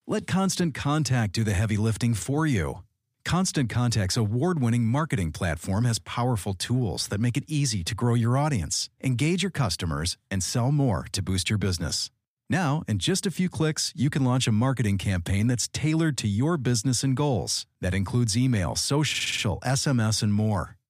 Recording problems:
audio stuttering; at 19 s

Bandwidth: 15 kHz